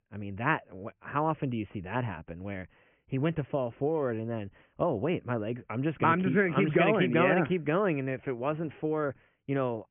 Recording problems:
high frequencies cut off; severe; nothing above 3 kHz

